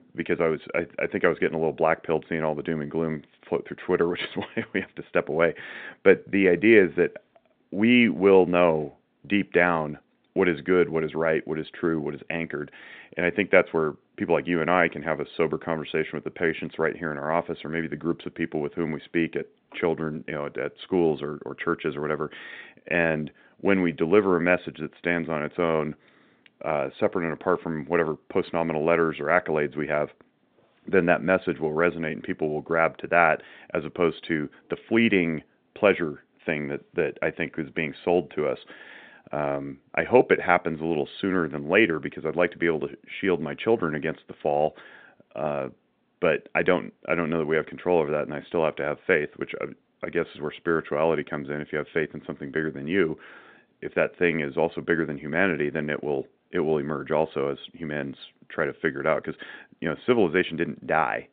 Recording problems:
phone-call audio

